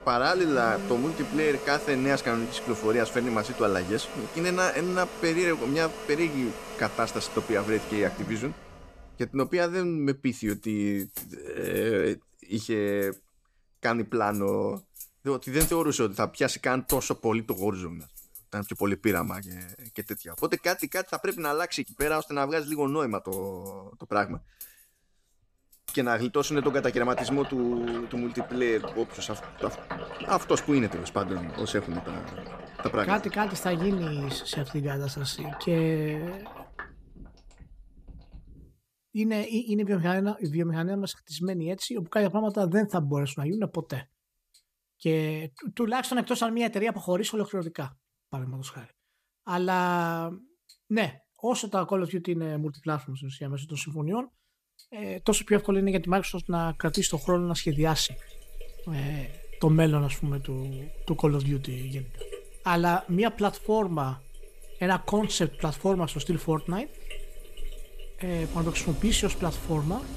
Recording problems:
household noises; noticeable; throughout; 10 dB below the speech

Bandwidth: 14.5 kHz